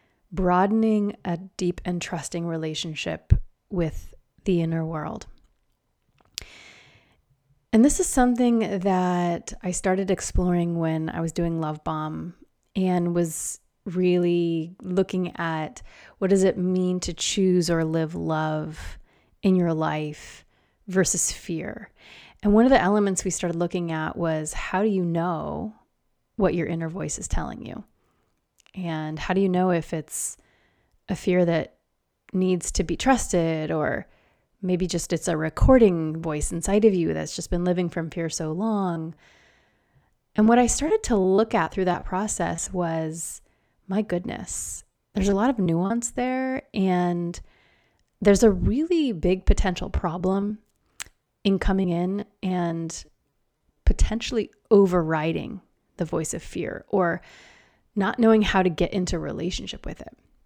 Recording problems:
choppy; very; from 39 to 43 s, from 45 to 46 s and from 50 to 53 s; 8% of the speech affected

